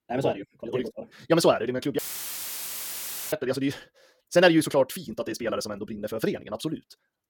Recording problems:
wrong speed, natural pitch; too fast; 1.8 times normal speed
audio cutting out; filled with static; at 2 s for 1.5 s

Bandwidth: 17 kHz